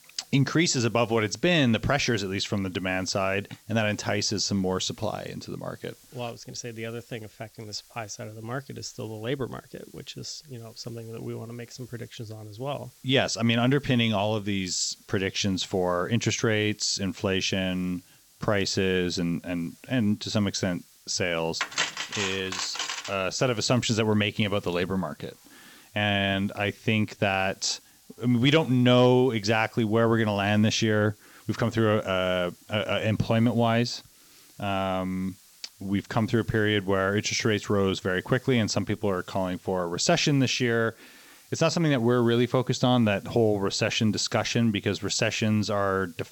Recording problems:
high frequencies cut off; noticeable; nothing above 8 kHz
hiss; faint; throughout; 30 dB below the speech
clattering dishes; noticeable; from 22 to 23 s; peak 2 dB below the speech

